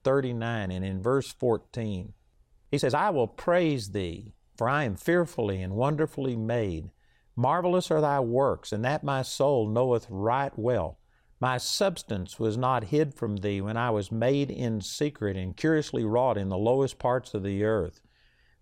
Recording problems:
uneven, jittery; strongly; from 1 to 18 s

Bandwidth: 16 kHz